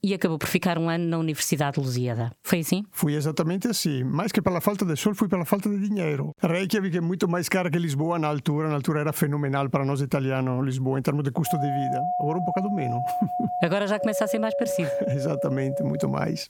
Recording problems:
squashed, flat; somewhat
doorbell; noticeable; from 11 s on; peak 1 dB below the speech

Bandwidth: 17.5 kHz